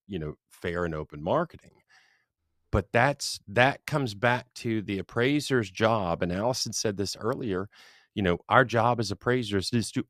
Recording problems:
none

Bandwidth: 14.5 kHz